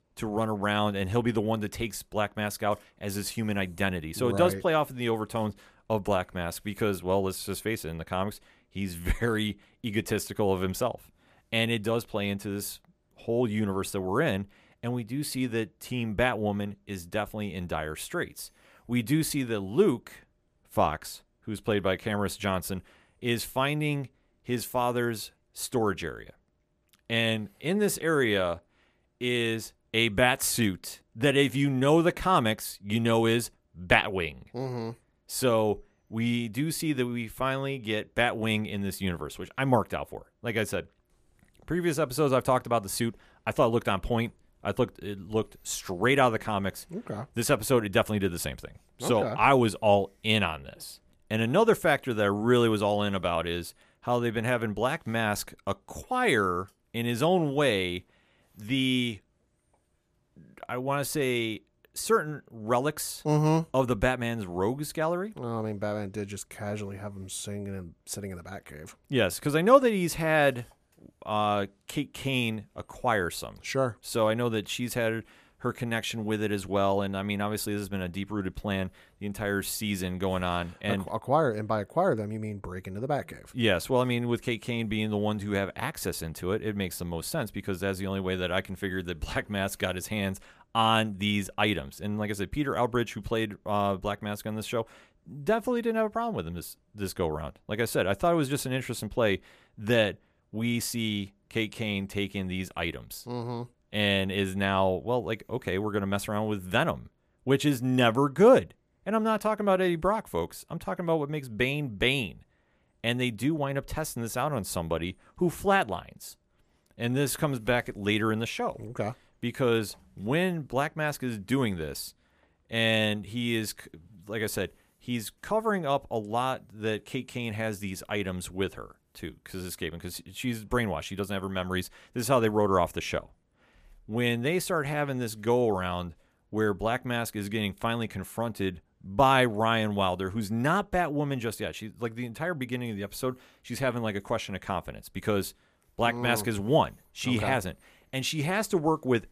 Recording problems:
none

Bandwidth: 14.5 kHz